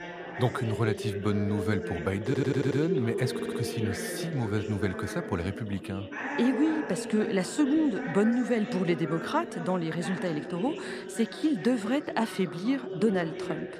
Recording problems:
background chatter; loud; throughout; 4 voices, 6 dB below the speech
audio stuttering; at 2.5 s and at 3.5 s

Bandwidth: 14.5 kHz